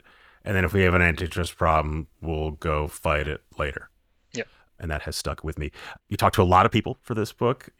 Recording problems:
uneven, jittery; strongly; from 0.5 to 7 s

